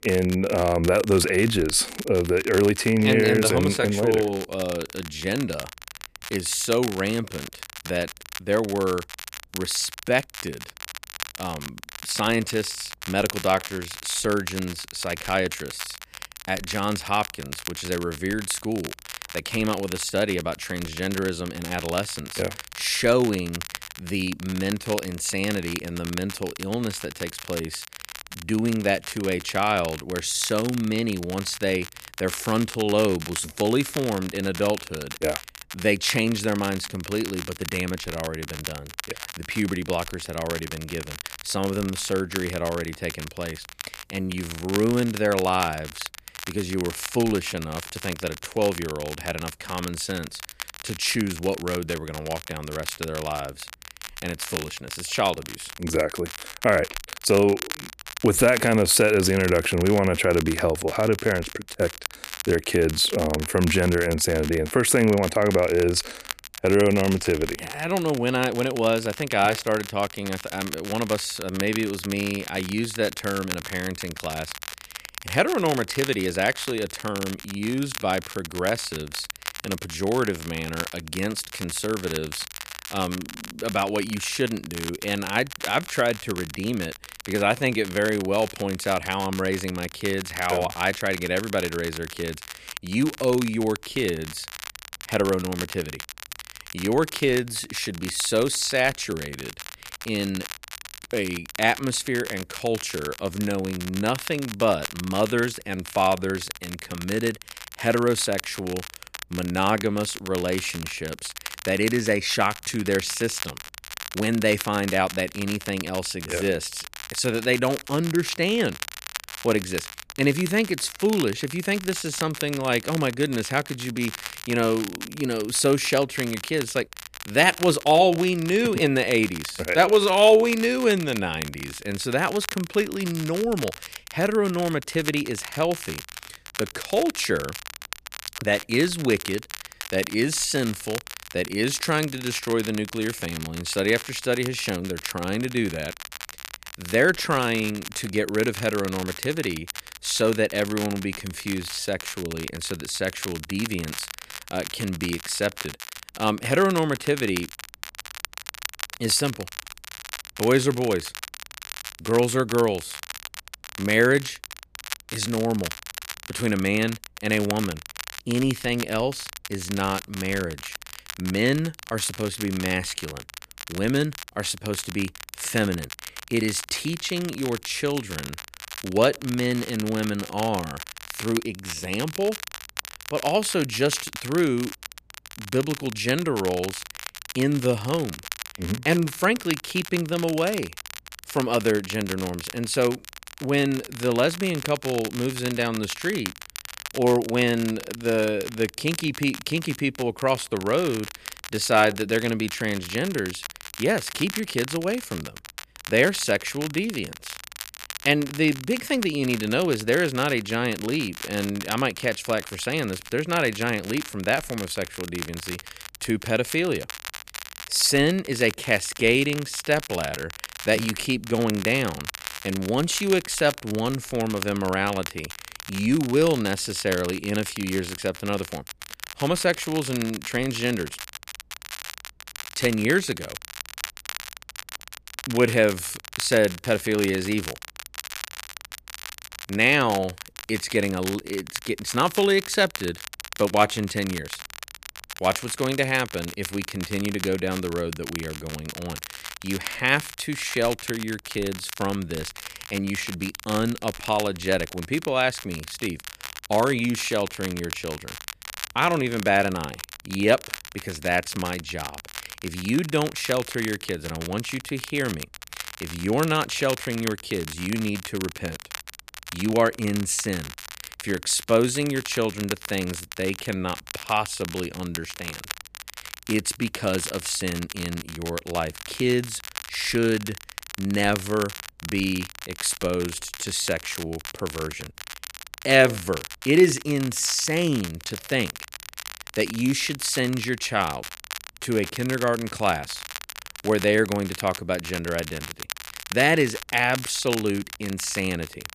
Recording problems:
crackle, like an old record; noticeable; 10 dB below the speech

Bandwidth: 14.5 kHz